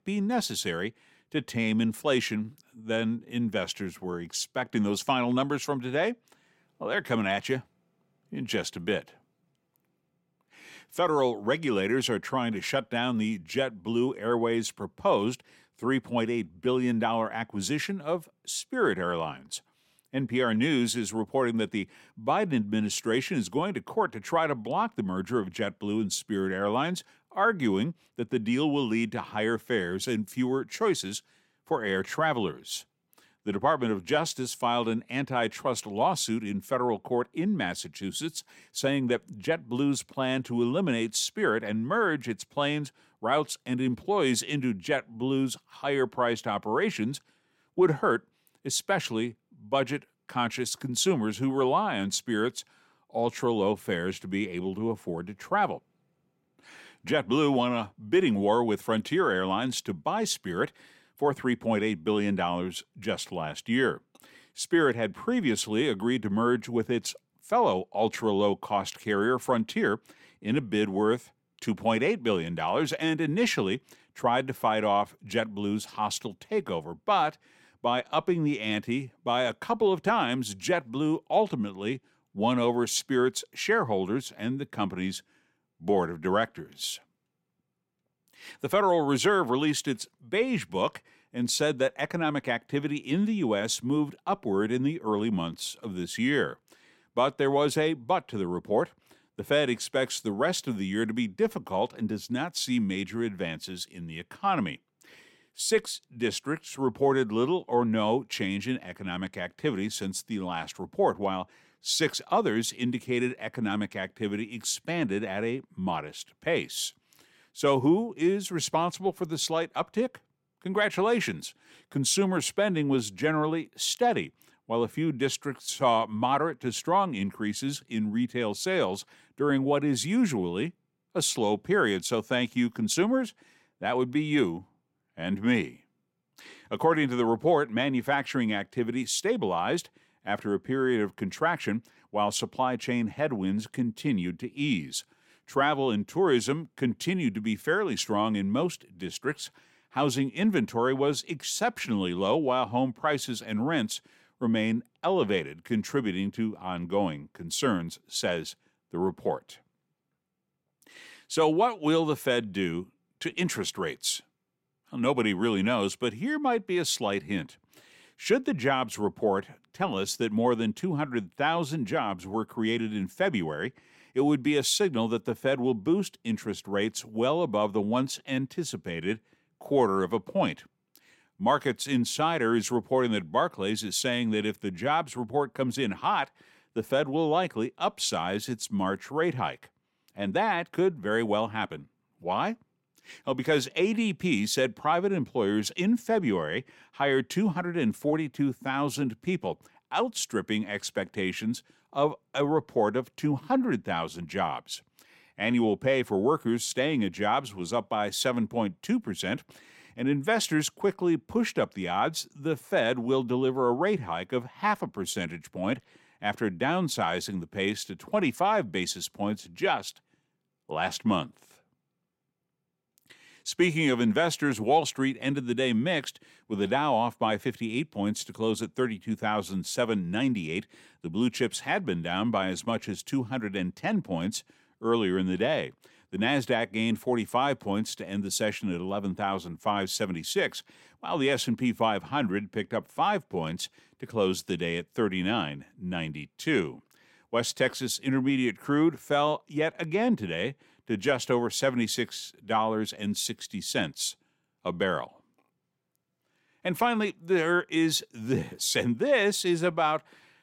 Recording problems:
none

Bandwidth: 16.5 kHz